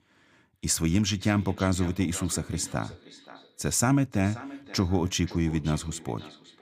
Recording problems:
echo of what is said; noticeable; throughout; 530 ms later, 20 dB below the speech

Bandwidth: 15 kHz